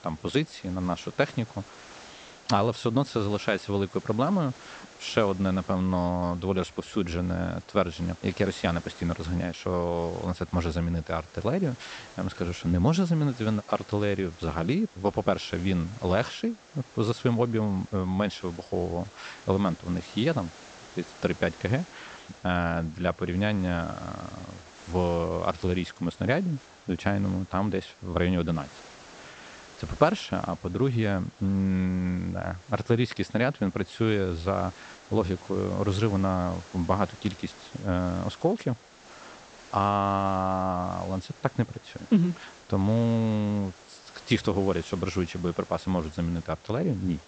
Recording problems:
high frequencies cut off; noticeable; nothing above 8 kHz
hiss; faint; throughout; 20 dB below the speech

